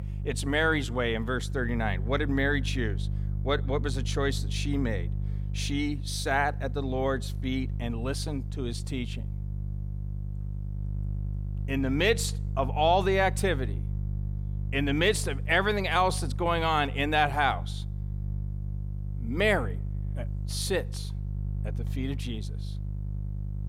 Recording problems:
electrical hum; faint; throughout; 50 Hz, 20 dB below the speech

